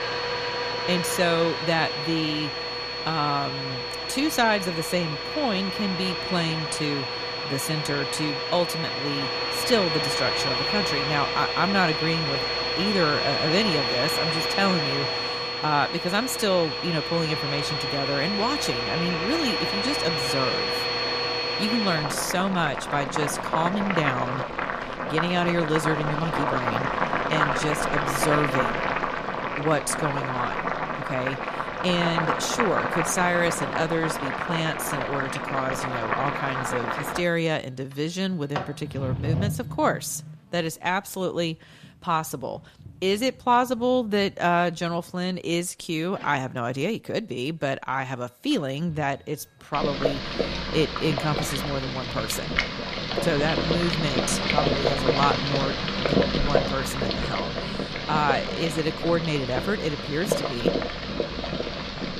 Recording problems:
household noises; very loud; throughout; as loud as the speech

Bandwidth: 14.5 kHz